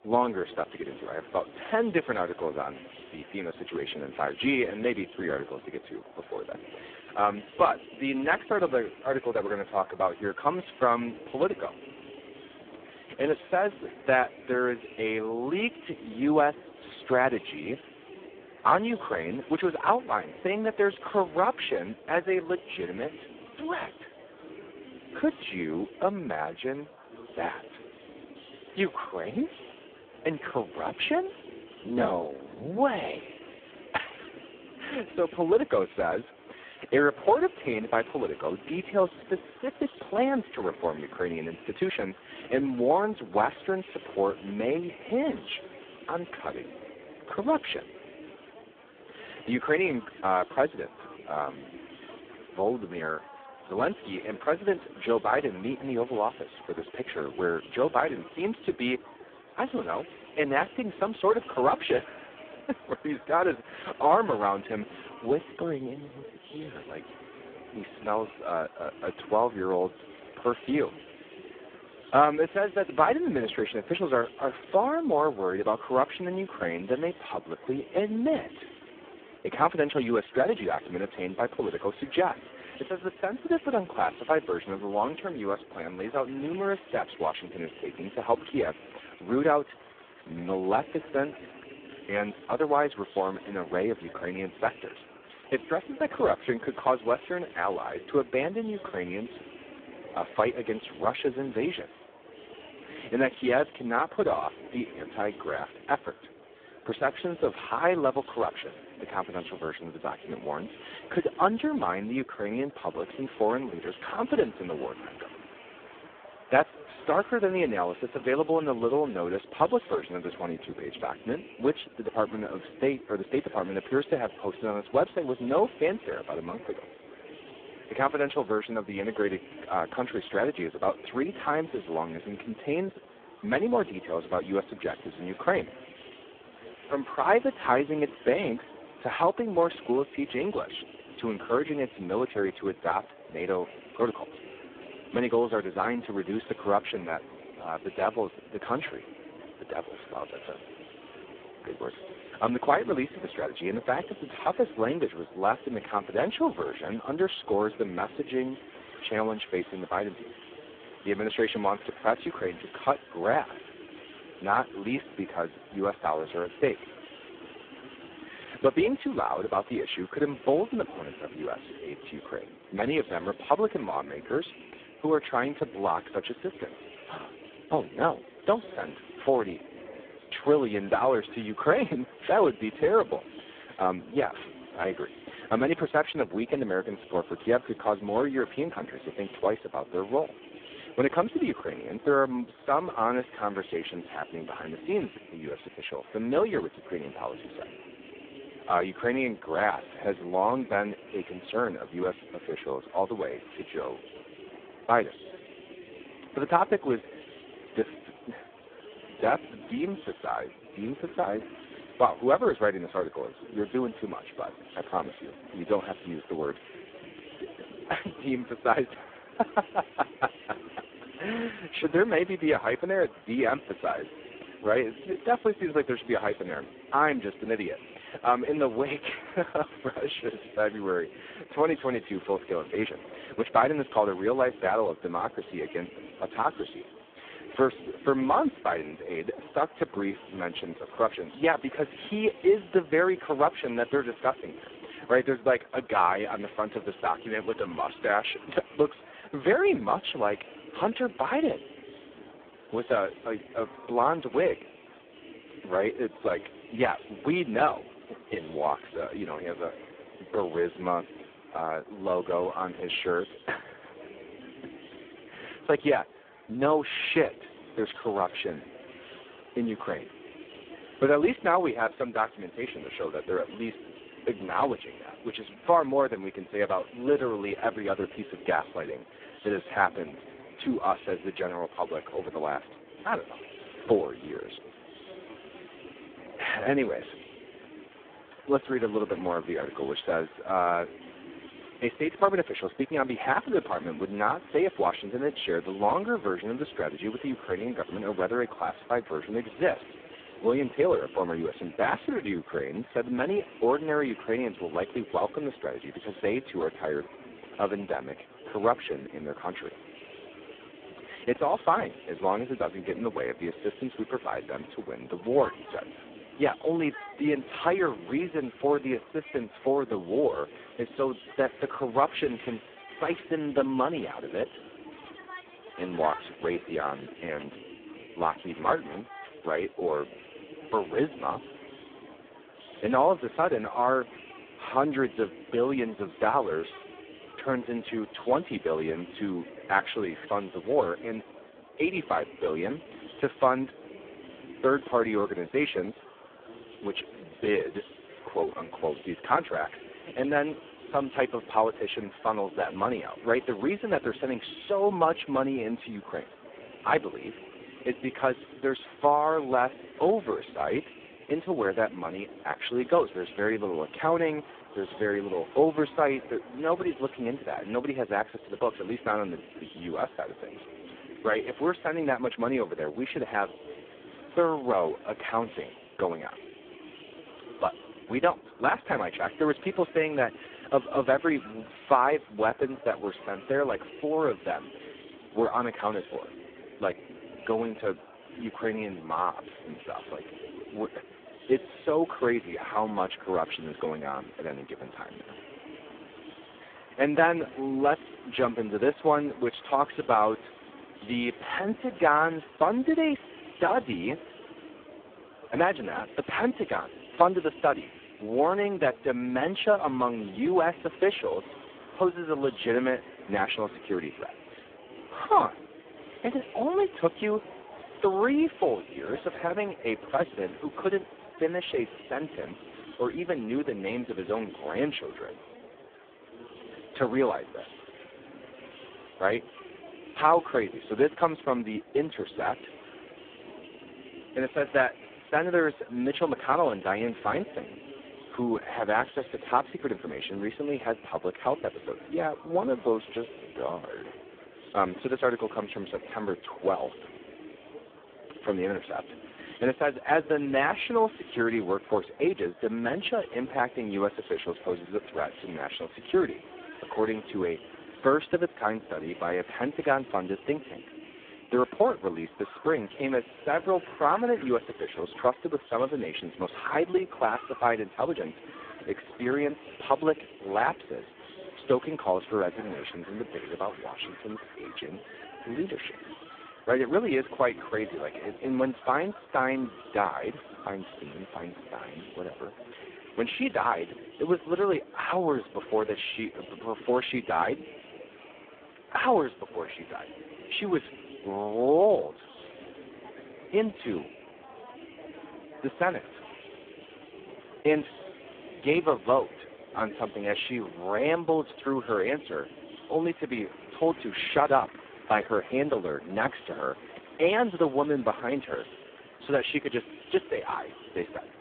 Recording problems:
phone-call audio; poor line
murmuring crowd; noticeable; throughout; 20 dB below the speech

